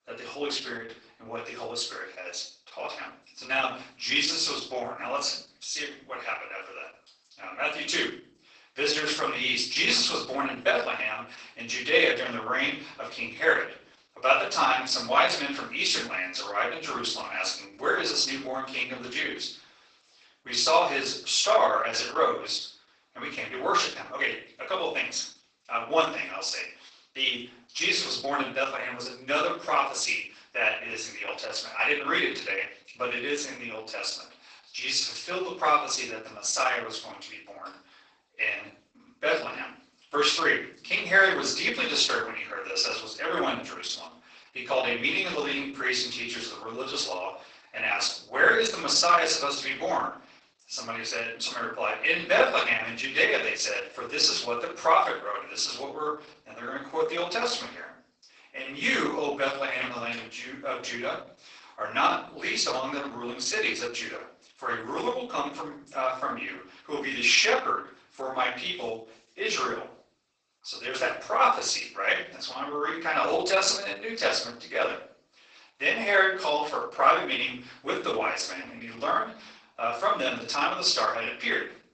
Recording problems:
off-mic speech; far
garbled, watery; badly; nothing above 8 kHz
thin; very; fading below 650 Hz
room echo; noticeable; dies away in 0.4 s

